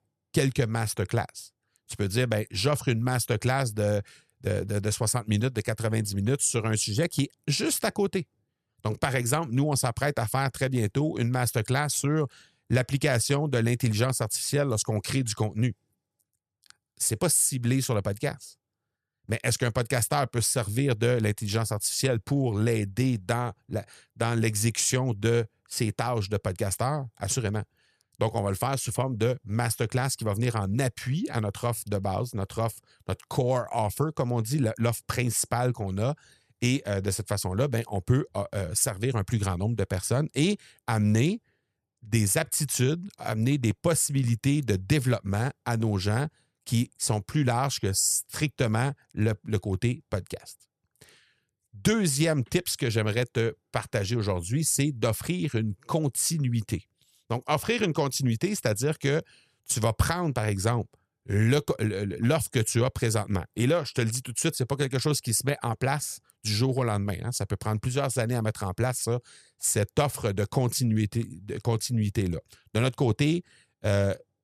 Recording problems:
none

